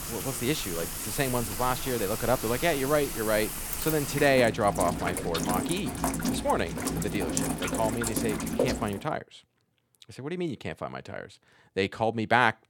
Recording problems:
rain or running water; loud; until 9 s; 3 dB below the speech

